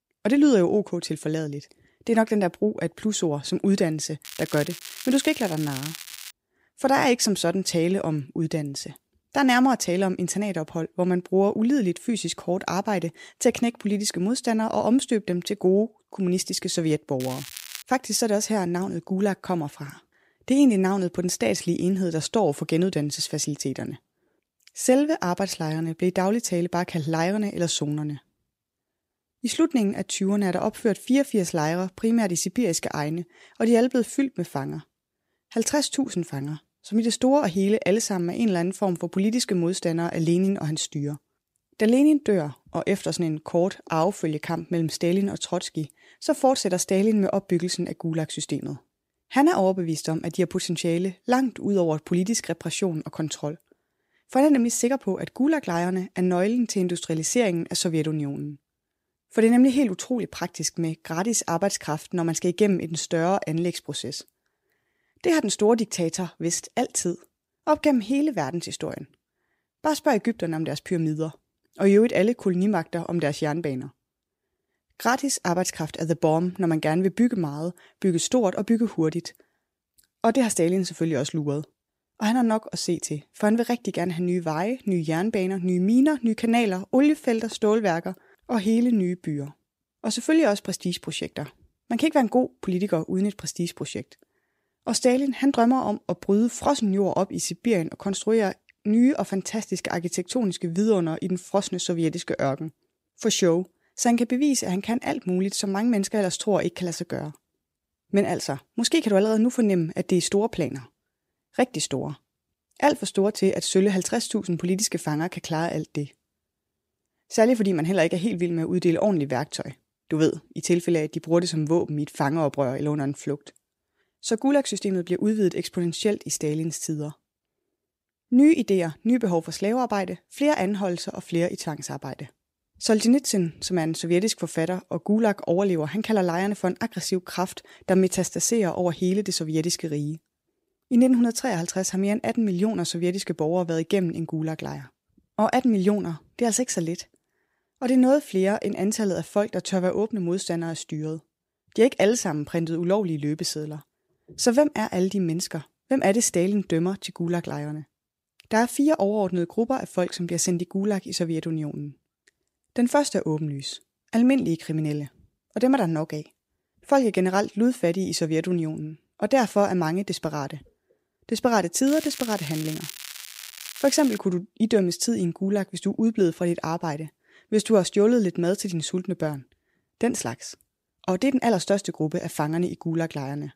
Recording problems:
crackling; noticeable; from 4.5 to 6.5 s, at 17 s and from 2:52 to 2:54; 15 dB below the speech

